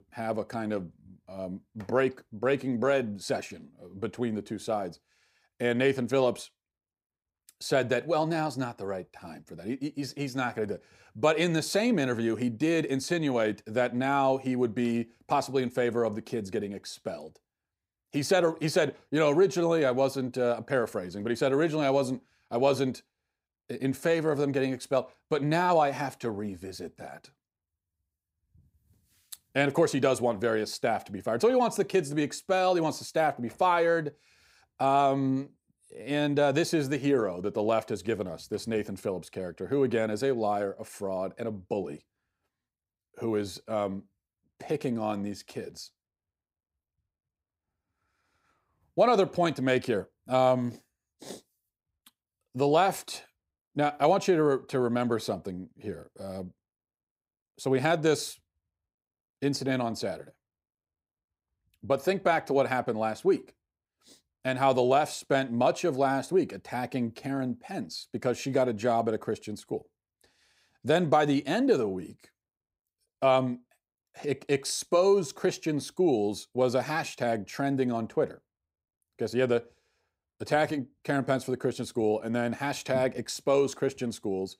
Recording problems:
none

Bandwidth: 15.5 kHz